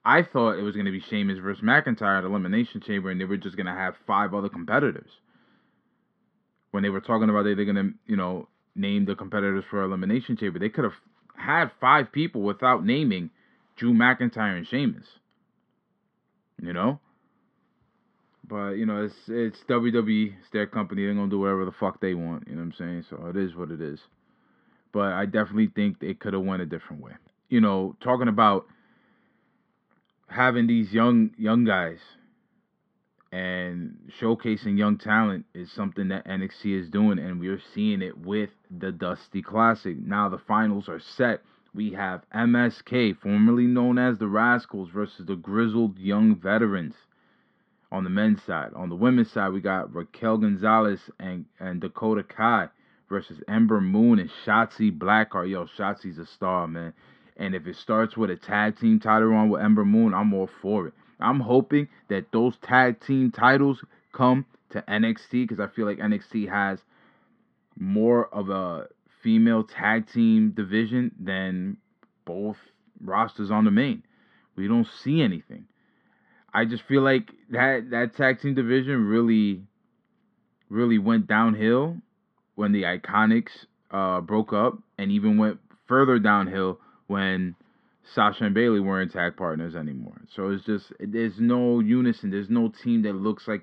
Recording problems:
muffled; slightly; fading above 3 kHz

